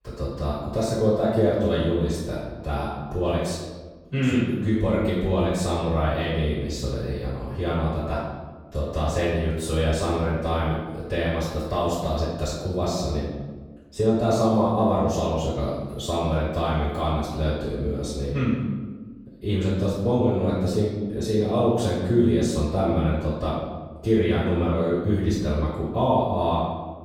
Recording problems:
room echo; strong; dies away in 1.2 s
off-mic speech; far

